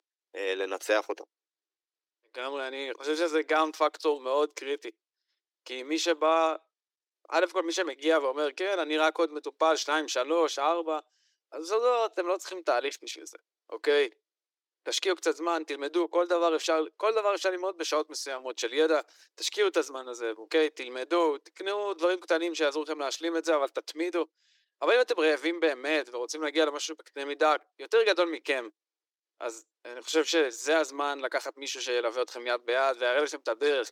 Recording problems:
thin; very; fading below 300 Hz

